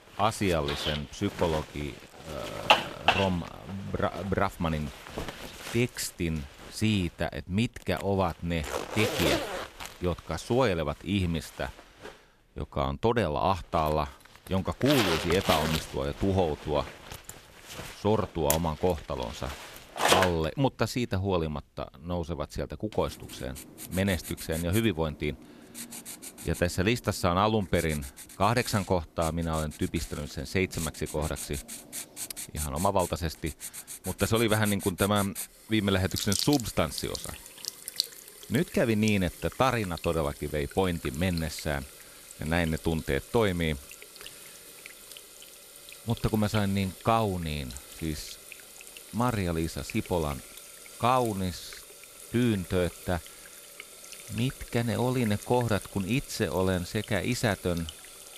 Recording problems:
household noises; loud; throughout; 7 dB below the speech

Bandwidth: 14.5 kHz